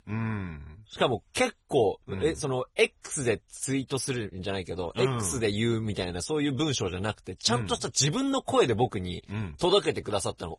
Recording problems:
garbled, watery; badly; nothing above 10.5 kHz

